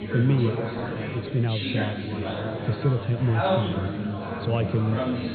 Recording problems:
high frequencies cut off; severe; nothing above 4.5 kHz
chatter from many people; loud; throughout; 2 dB below the speech
hiss; faint; throughout; 25 dB below the speech

